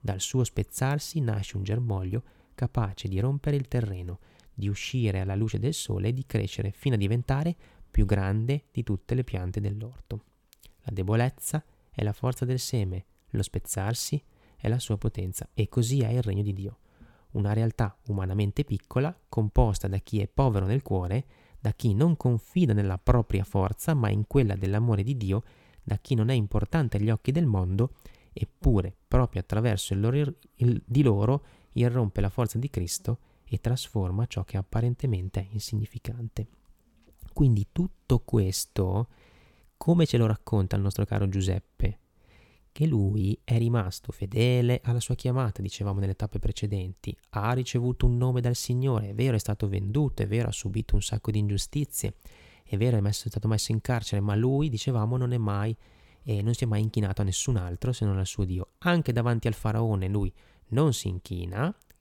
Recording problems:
none

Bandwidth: 17 kHz